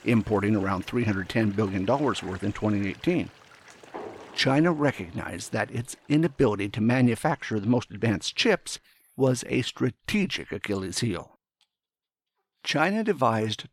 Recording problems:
animal sounds; faint; throughout; 20 dB below the speech

